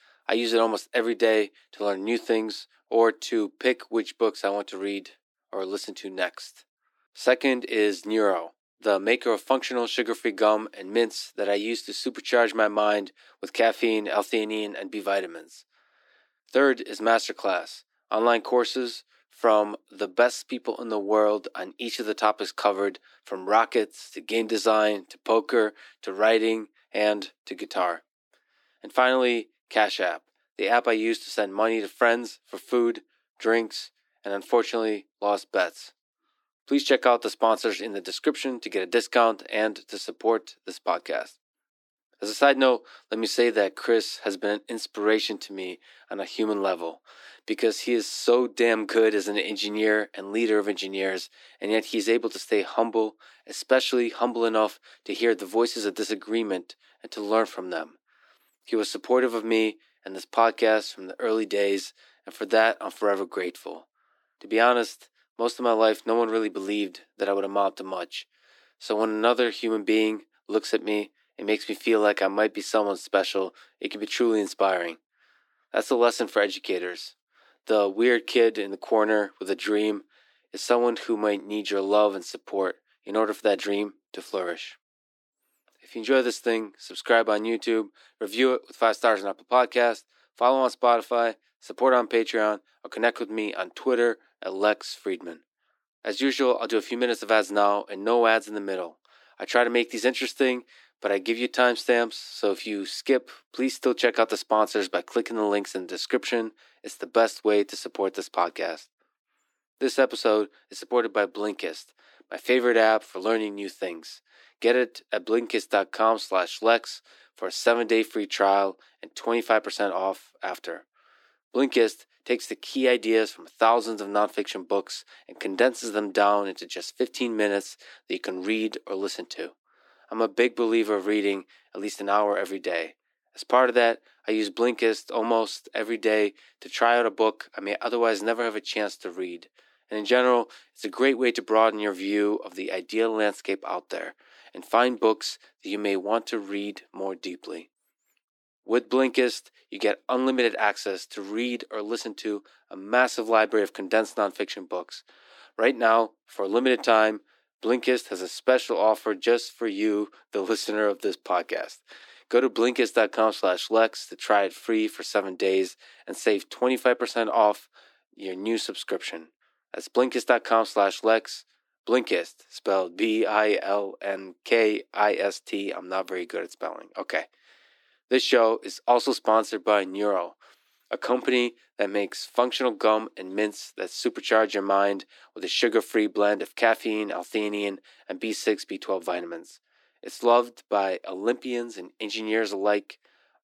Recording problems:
thin; somewhat; fading below 300 Hz

